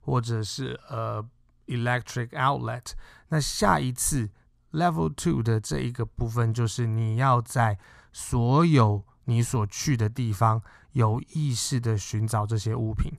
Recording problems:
none

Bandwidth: 14.5 kHz